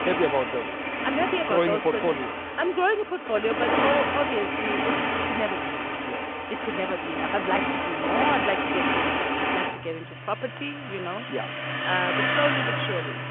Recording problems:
phone-call audio; nothing above 3.5 kHz
traffic noise; very loud; throughout; 2 dB above the speech

